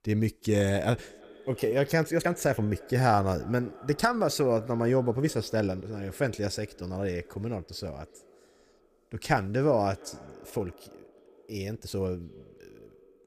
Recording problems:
echo of what is said; faint; throughout; 350 ms later, 20 dB below the speech
uneven, jittery; strongly; from 1.5 to 12 s

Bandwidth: 15 kHz